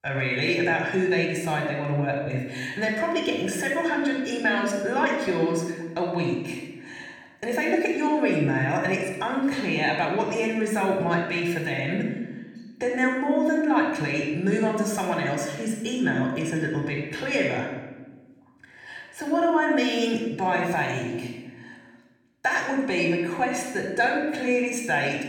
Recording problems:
room echo; noticeable; dies away in 1 s
off-mic speech; somewhat distant

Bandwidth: 17 kHz